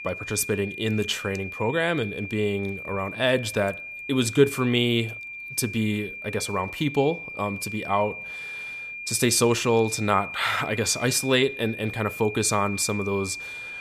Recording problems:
high-pitched whine; loud; throughout; 2.5 kHz, 9 dB below the speech

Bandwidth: 14.5 kHz